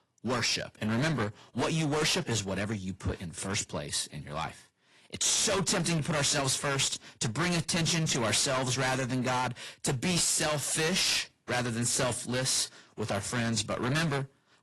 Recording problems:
distortion; heavy; 19% of the sound clipped
garbled, watery; slightly; nothing above 11.5 kHz

